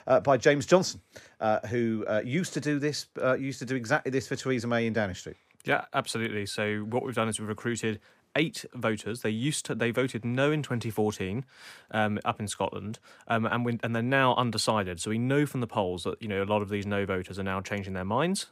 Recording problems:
none

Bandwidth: 15 kHz